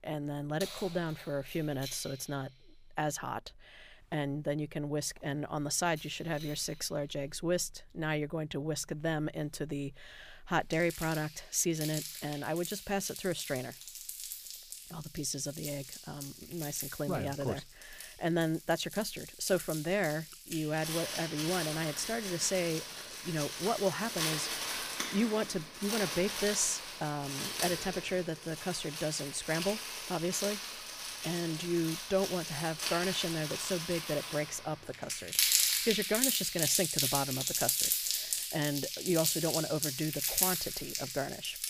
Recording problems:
household noises; loud; throughout; as loud as the speech

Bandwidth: 15 kHz